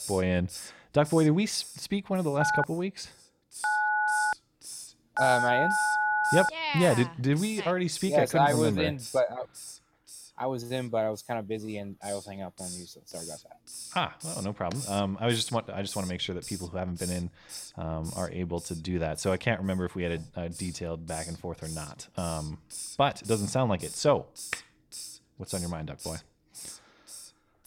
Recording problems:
hiss; noticeable; throughout; 10 dB below the speech
phone ringing; loud; from 2.5 to 6.5 s; peak 4 dB above the speech

